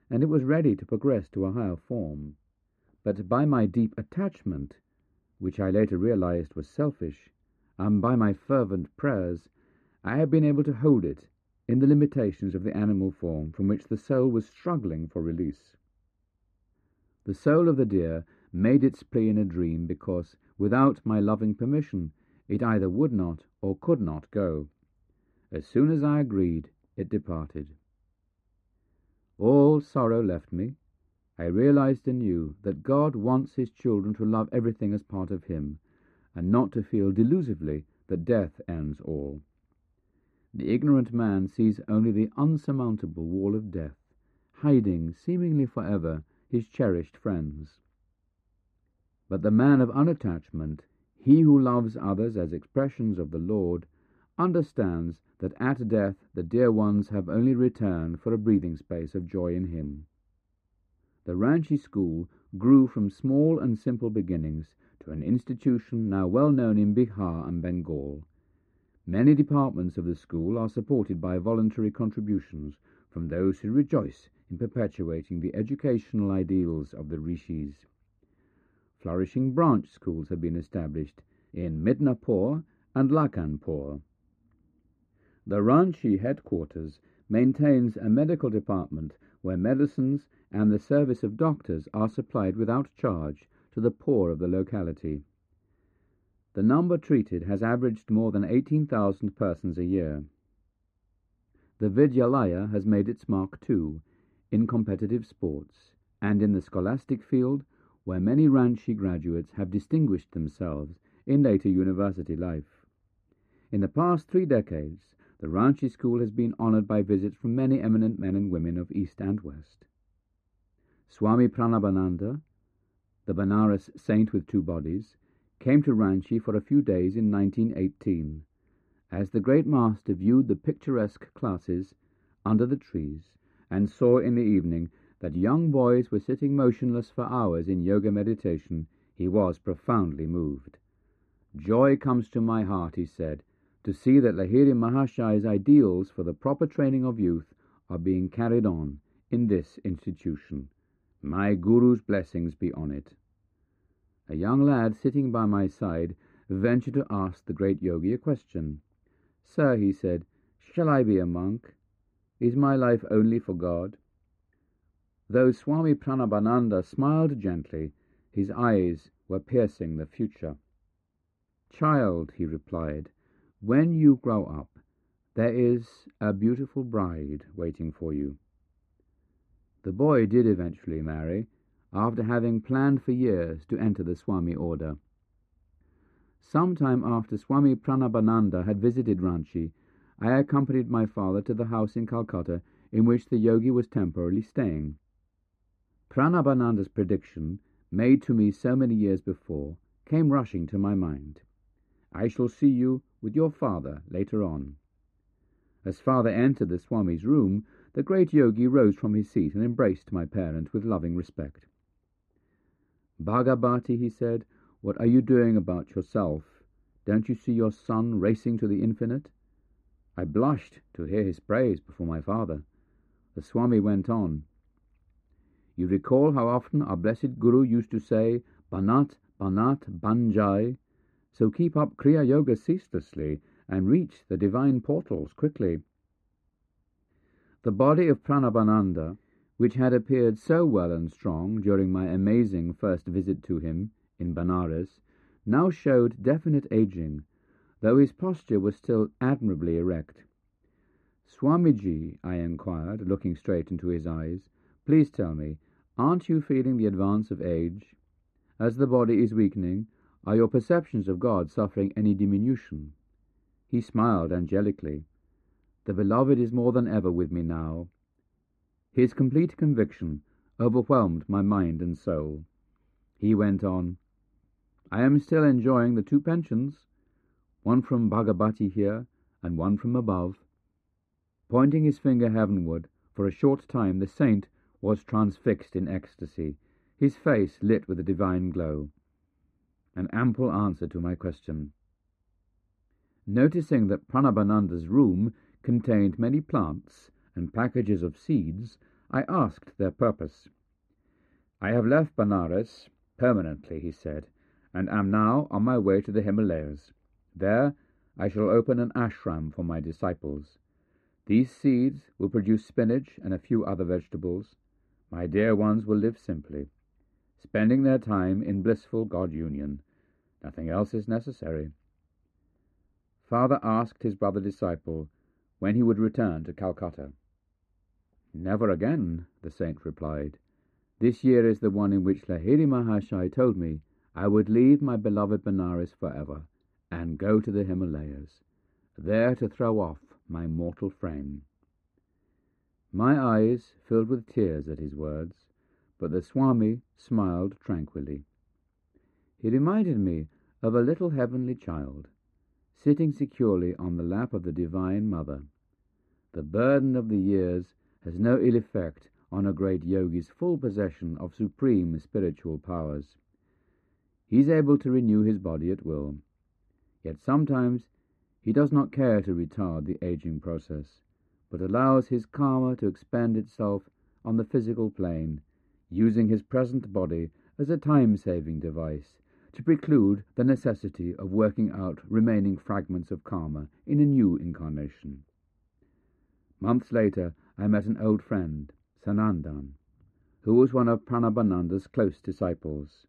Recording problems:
muffled; very; fading above 3 kHz

